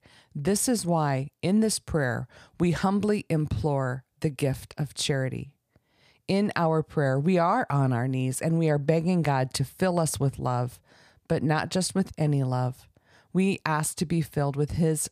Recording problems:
none

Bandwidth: 15 kHz